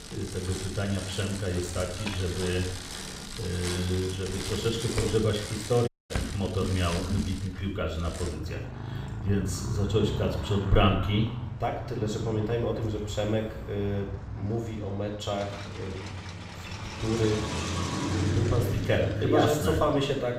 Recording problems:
off-mic speech; far
room echo; noticeable; dies away in 0.7 s
traffic noise; loud; throughout; 6 dB below the speech
audio cutting out; at 6 s

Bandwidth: 15.5 kHz